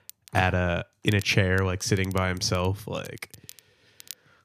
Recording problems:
crackle, like an old record; faint; 20 dB below the speech

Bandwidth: 14.5 kHz